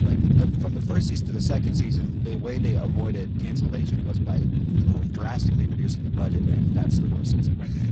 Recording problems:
garbled, watery; badly; nothing above 7.5 kHz
wind noise on the microphone; heavy; 3 dB above the speech
uneven, jittery; strongly; from 0.5 to 5.5 s

